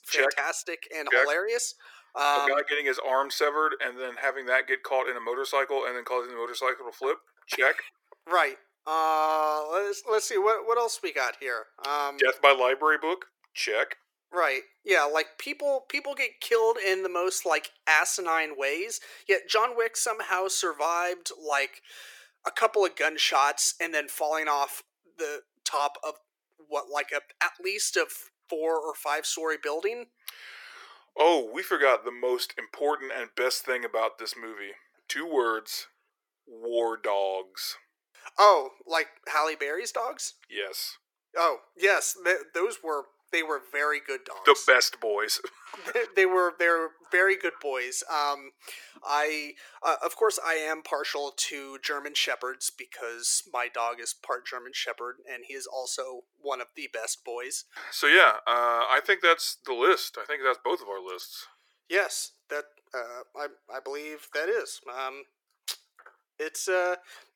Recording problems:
thin; very; fading below 400 Hz

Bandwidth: 17.5 kHz